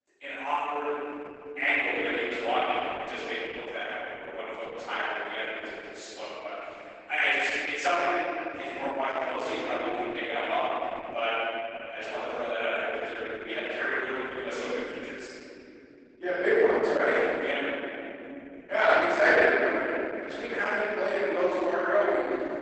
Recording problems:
room echo; strong; dies away in 3 s
off-mic speech; far
garbled, watery; badly; nothing above 8 kHz
thin; somewhat; fading below 300 Hz

